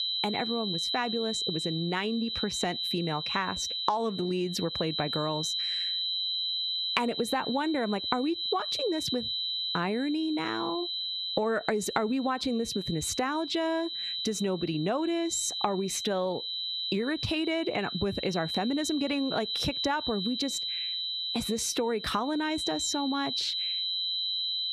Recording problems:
squashed, flat; heavily
high-pitched whine; loud; throughout; 4 kHz, 2 dB below the speech

